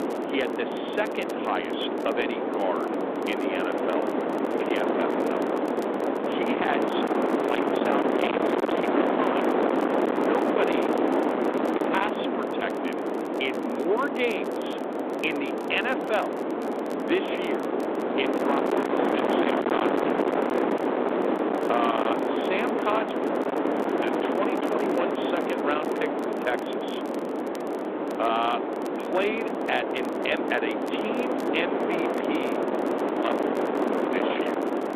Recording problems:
distortion; heavy; 20% of the sound clipped
phone-call audio
wind noise on the microphone; heavy; 2 dB above the speech
crackle, like an old record; faint; 25 dB below the speech

